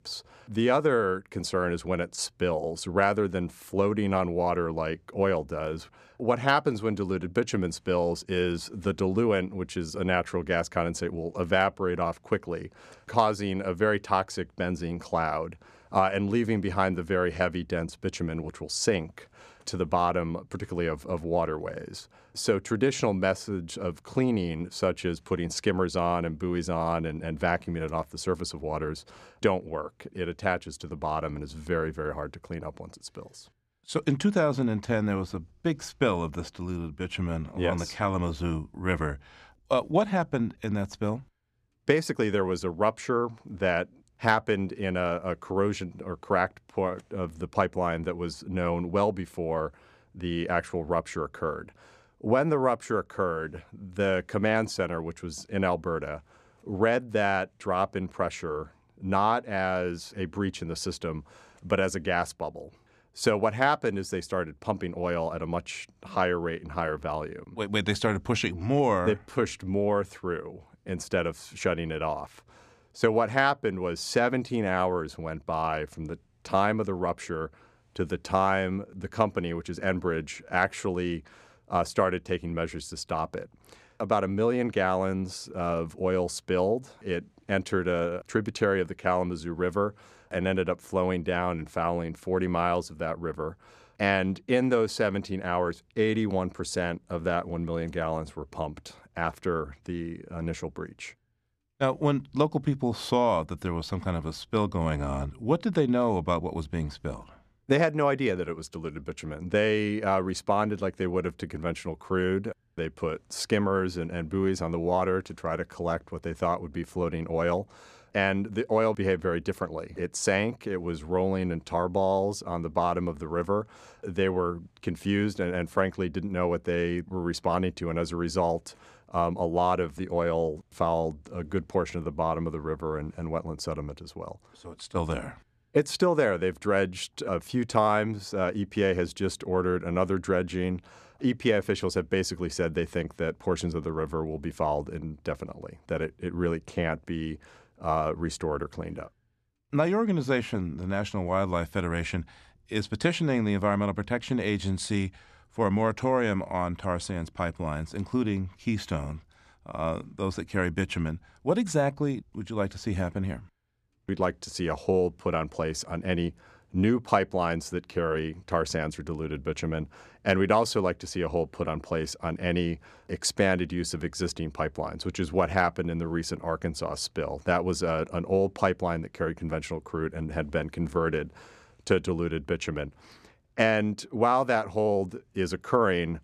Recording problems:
none

